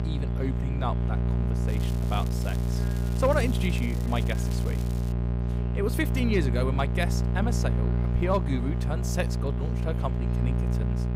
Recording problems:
electrical hum; loud; throughout; 60 Hz, 6 dB below the speech
crackling; noticeable; from 1.5 to 5 s; 15 dB below the speech
murmuring crowd; faint; throughout; 20 dB below the speech

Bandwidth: 15.5 kHz